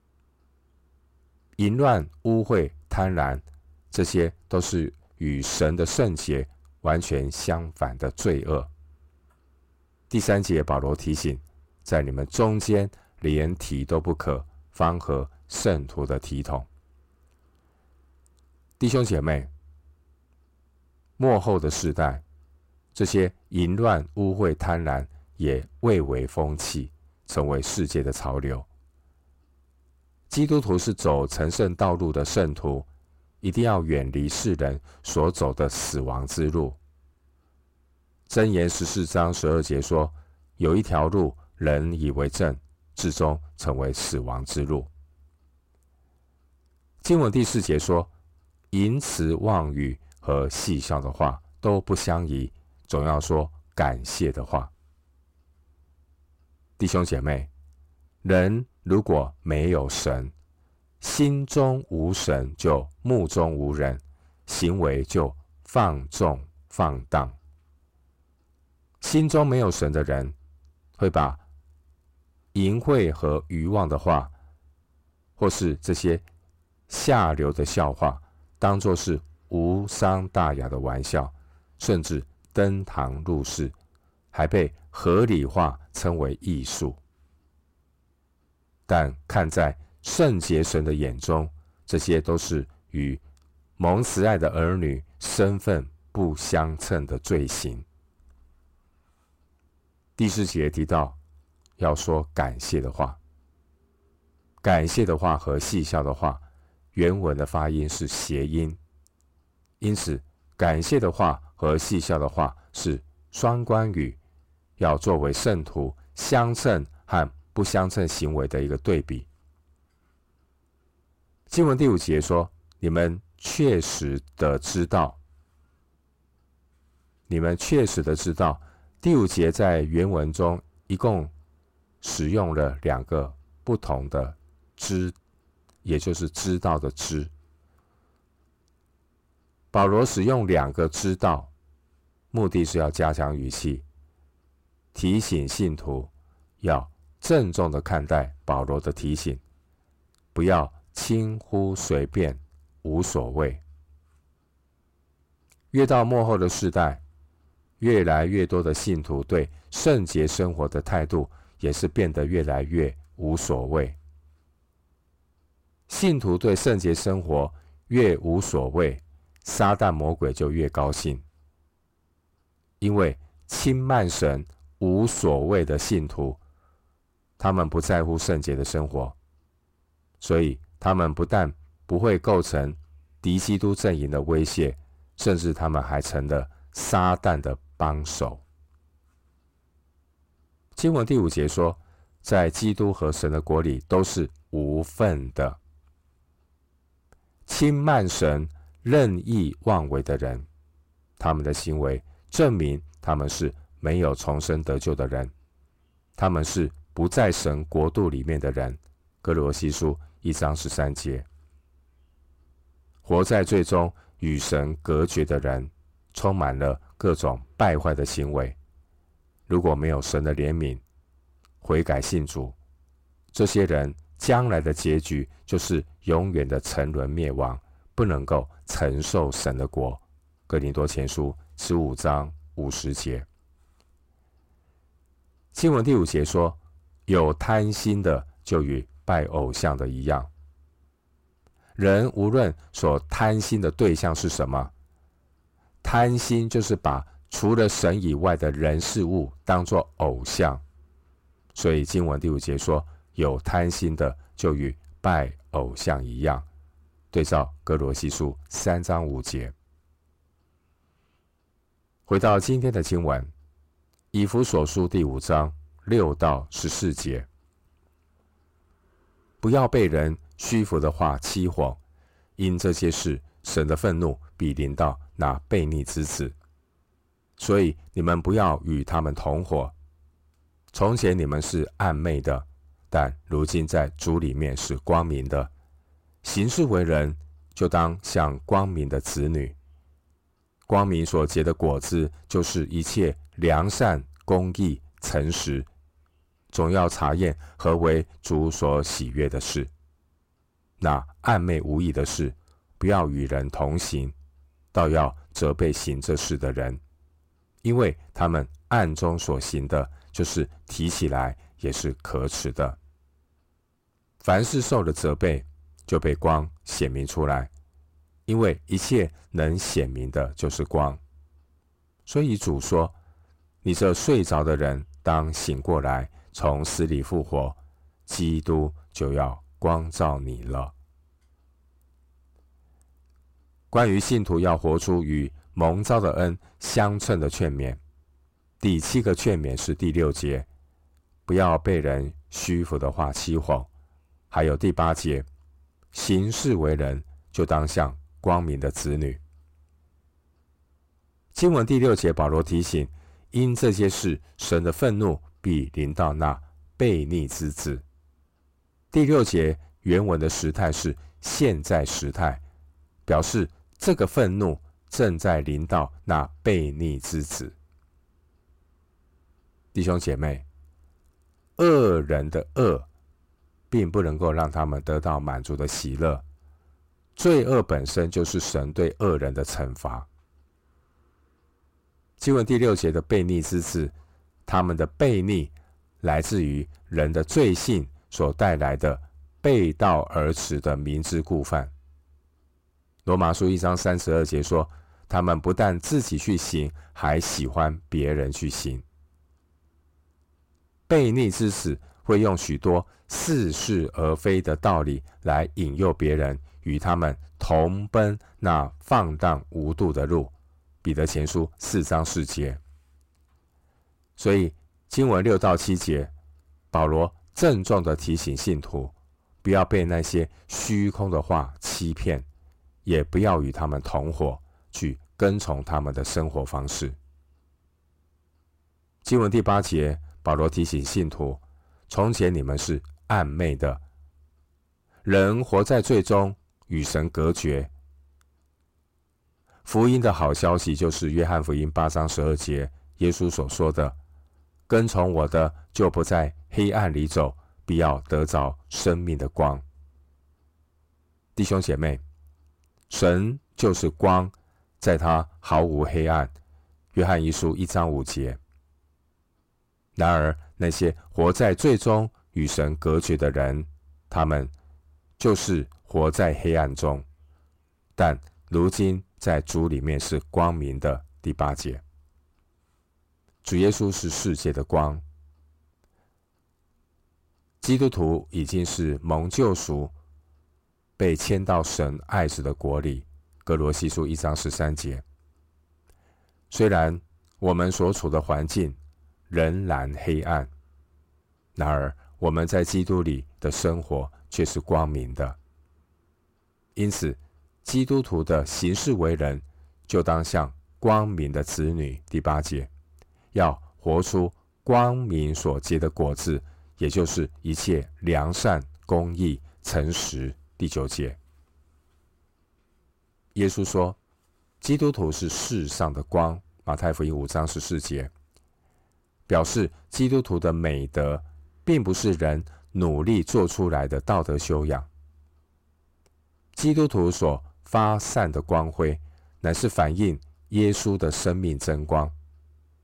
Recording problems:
distortion; slight; 10 dB below the speech

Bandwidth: 16 kHz